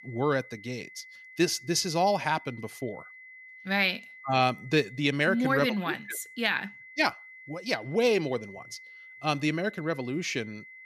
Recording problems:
high-pitched whine; noticeable; throughout; 2 kHz, 20 dB below the speech

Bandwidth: 14.5 kHz